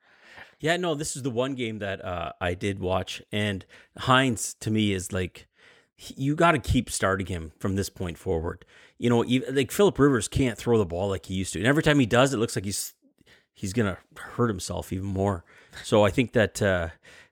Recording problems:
none

